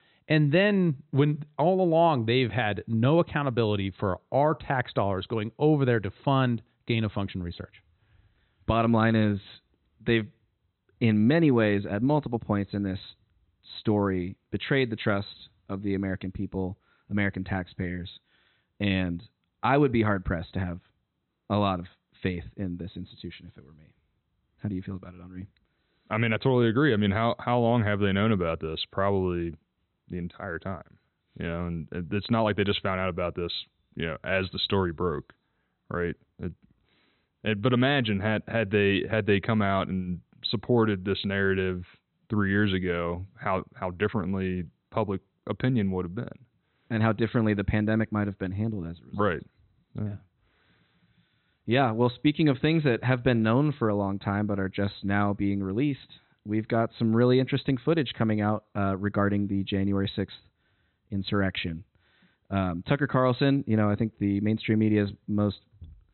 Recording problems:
high frequencies cut off; severe; nothing above 4 kHz

